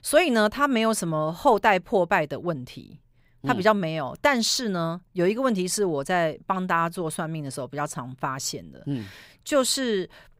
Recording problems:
none

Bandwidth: 15.5 kHz